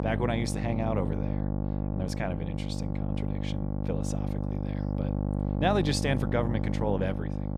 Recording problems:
electrical hum; loud; throughout; 50 Hz, 6 dB below the speech

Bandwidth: 15.5 kHz